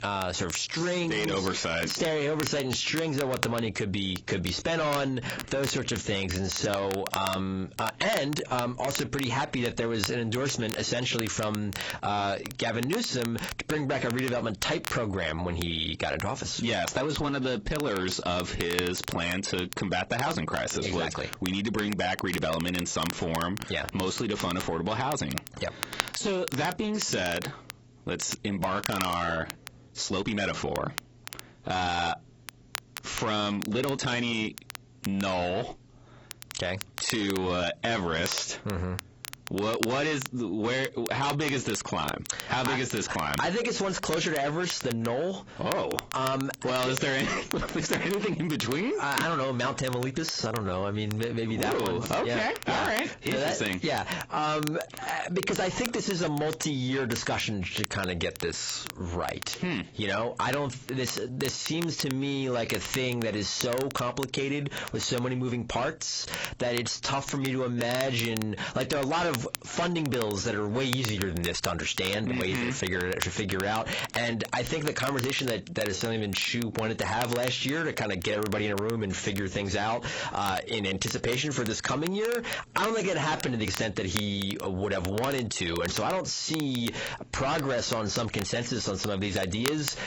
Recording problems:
distortion; heavy; 6 dB below the speech
garbled, watery; badly; nothing above 8 kHz
squashed, flat; heavily
crackle, like an old record; noticeable; 10 dB below the speech
uneven, jittery; strongly; from 0.5 s to 1:24

